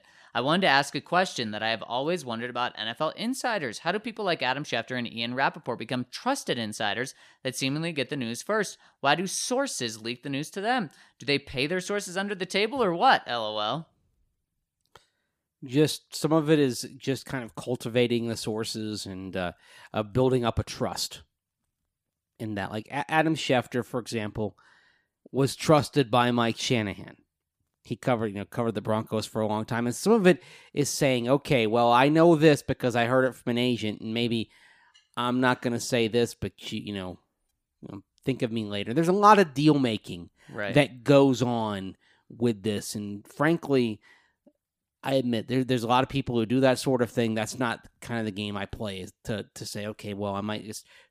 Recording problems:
none

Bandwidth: 15 kHz